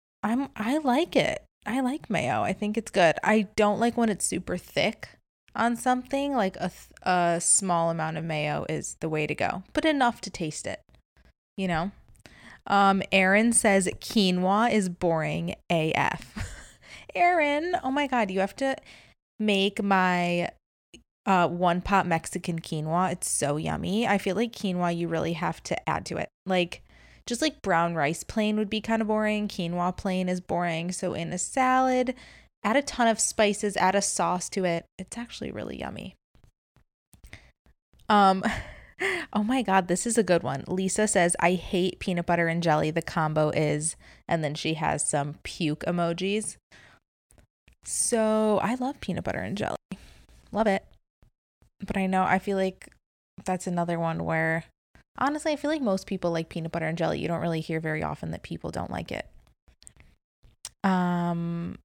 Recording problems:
uneven, jittery; strongly; from 0.5 to 59 s

